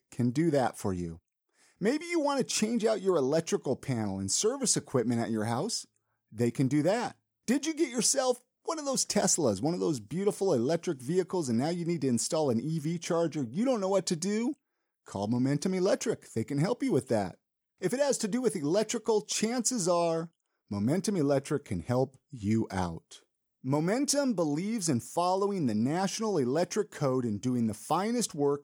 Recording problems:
none

